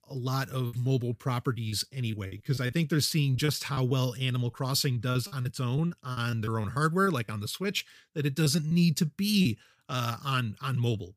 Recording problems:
choppy; very; 8% of the speech affected

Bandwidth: 15 kHz